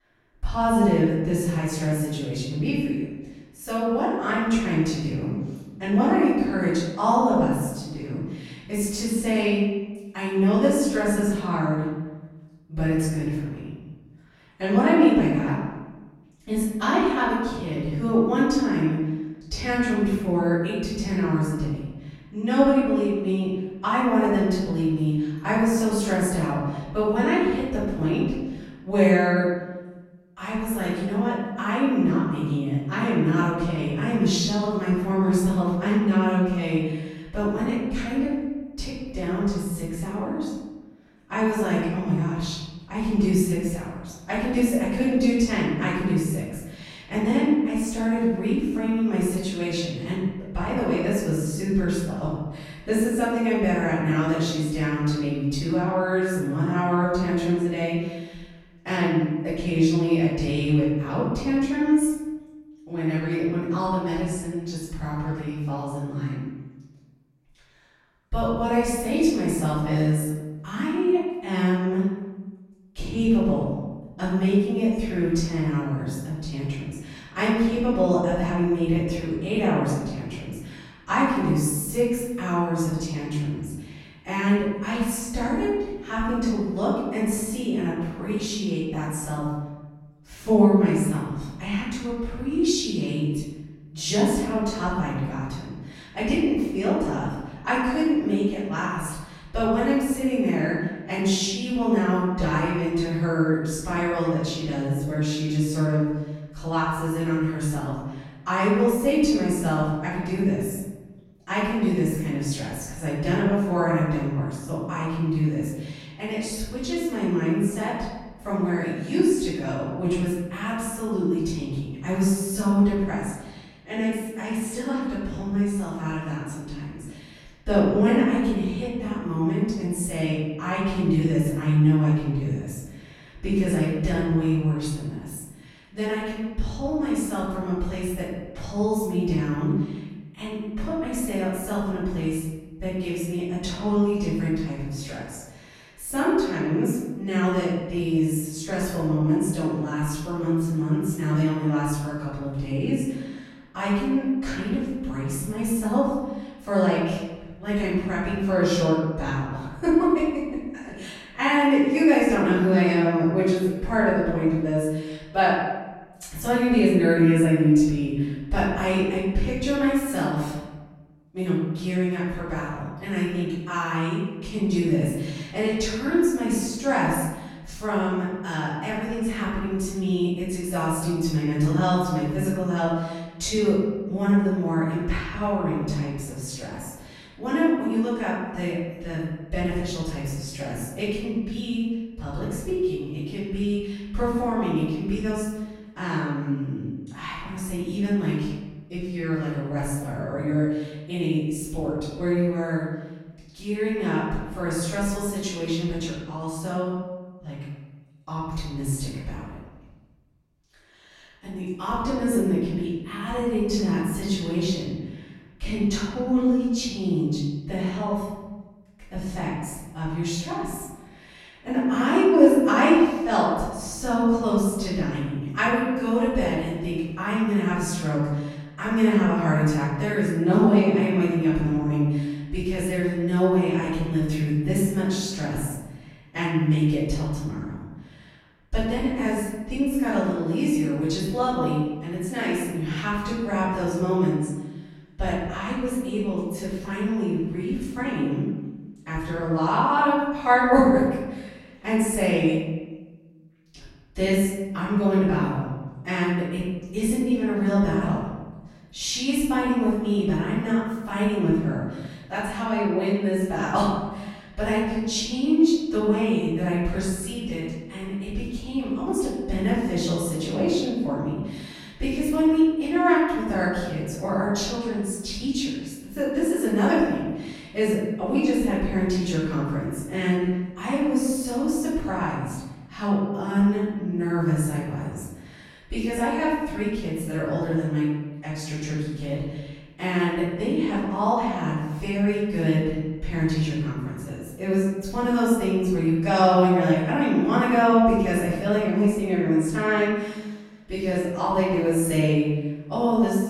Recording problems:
room echo; strong; dies away in 1.1 s
off-mic speech; far

